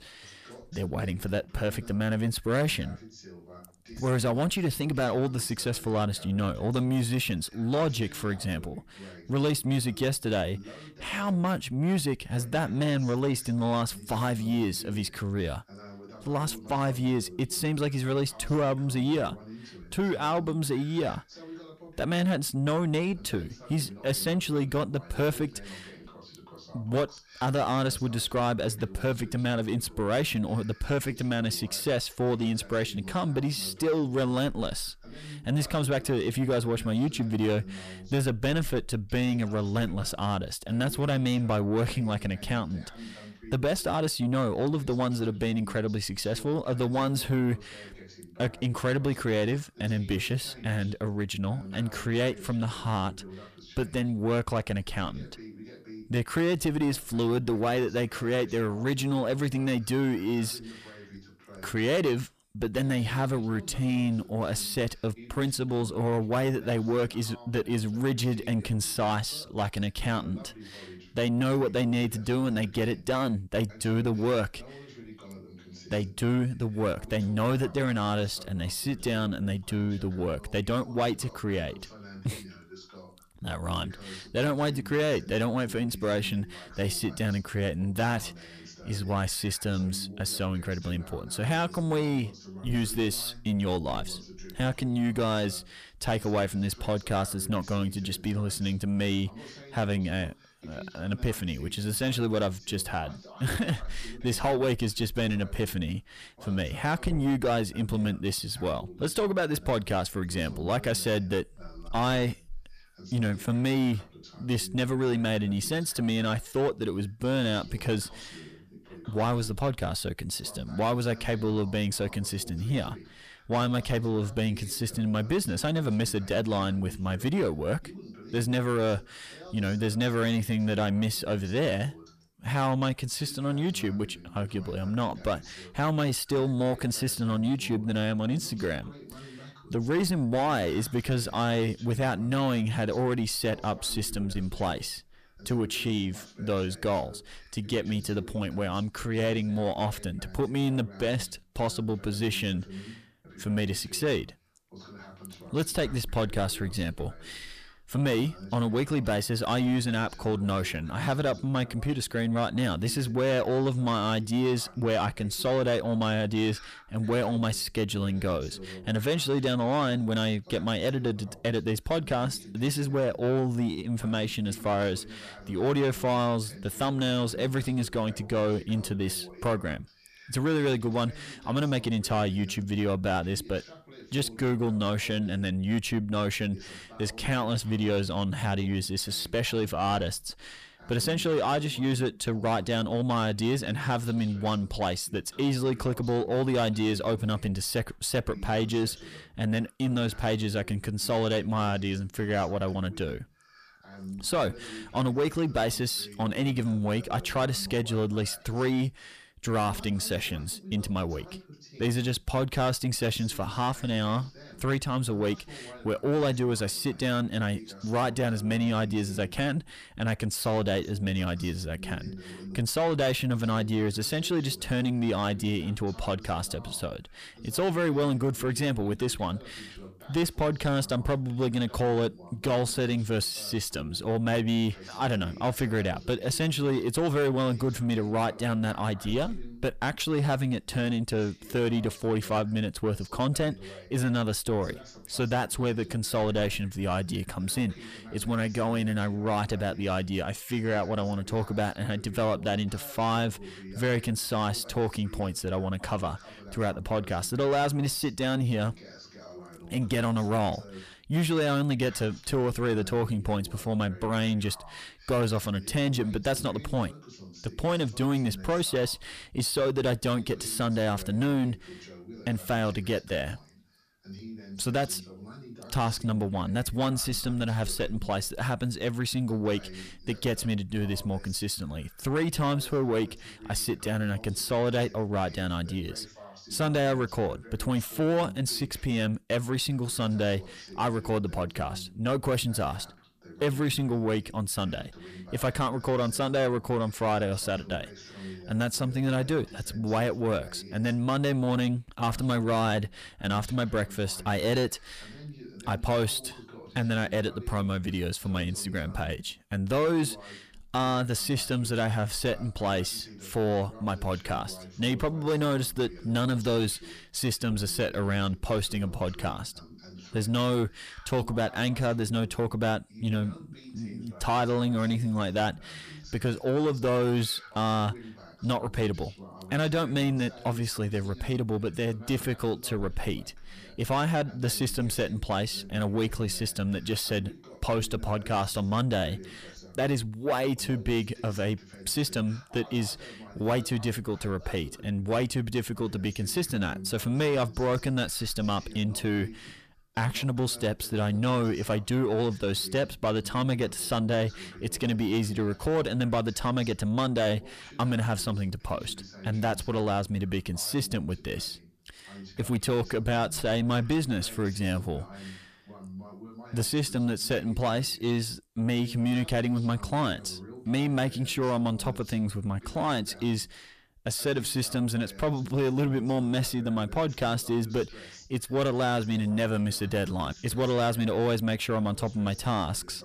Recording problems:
distortion; slight; 10 dB below the speech
voice in the background; noticeable; throughout; 20 dB below the speech

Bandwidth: 14.5 kHz